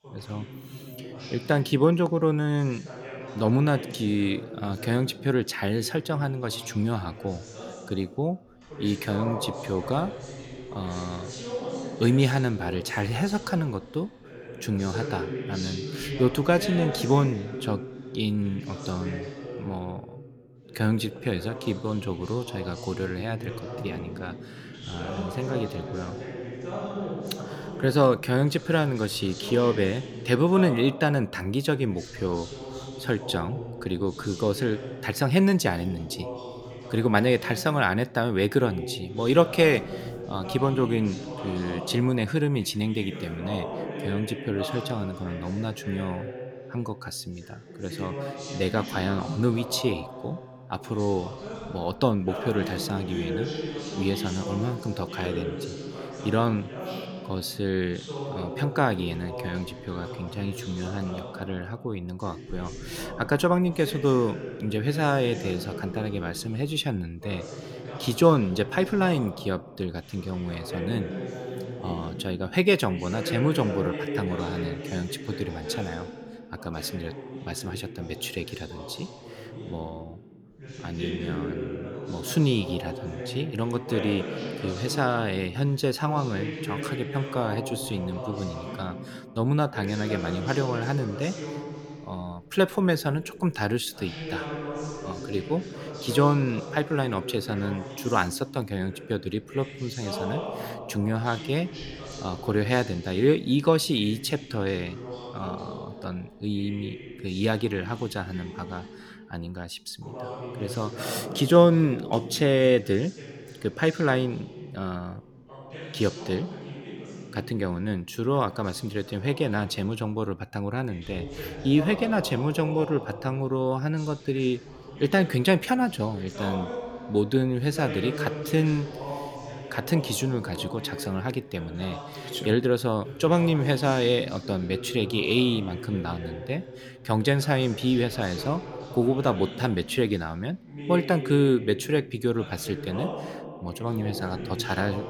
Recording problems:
voice in the background; loud; throughout; 10 dB below the speech

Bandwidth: 18.5 kHz